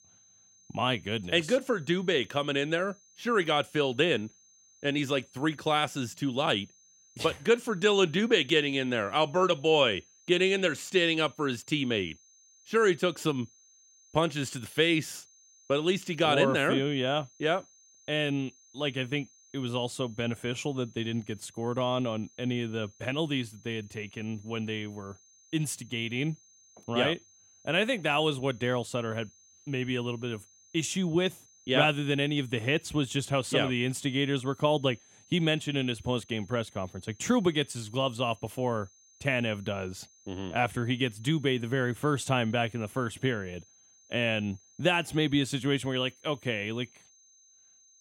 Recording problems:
high-pitched whine; faint; throughout; 6.5 kHz, 30 dB below the speech

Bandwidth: 16 kHz